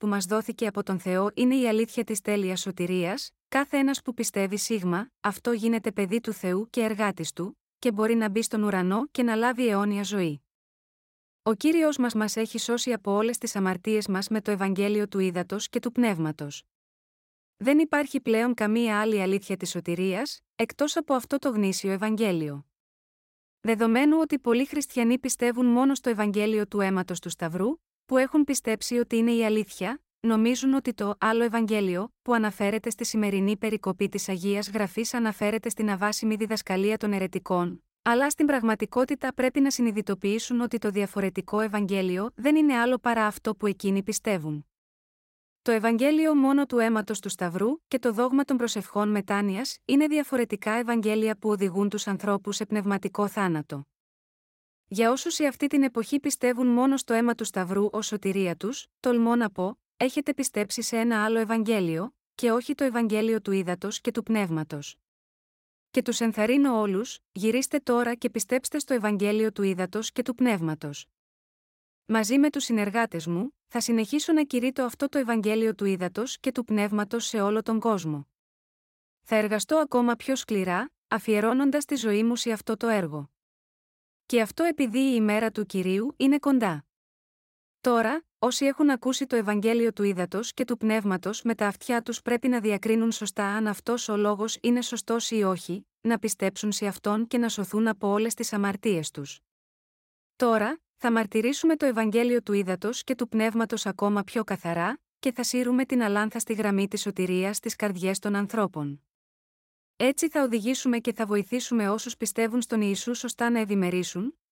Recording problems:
none

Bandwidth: 16 kHz